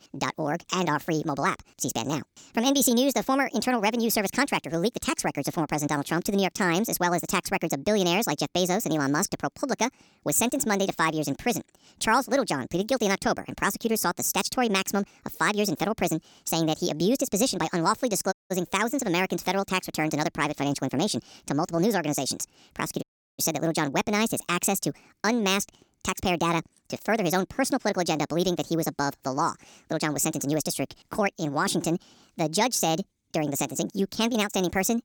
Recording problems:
wrong speed and pitch; too fast and too high; 1.5 times normal speed
audio cutting out; at 18 s and at 23 s

